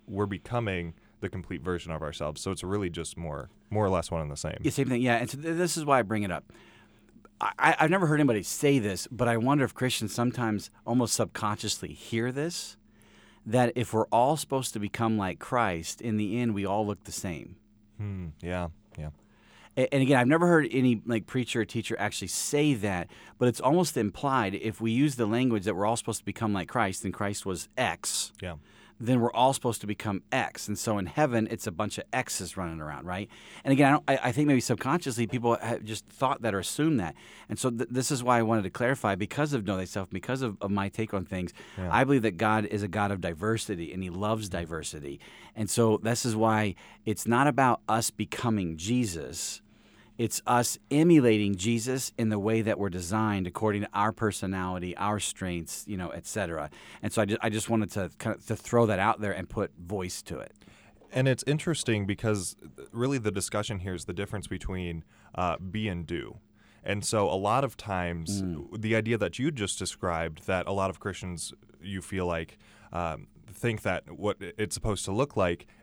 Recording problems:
none

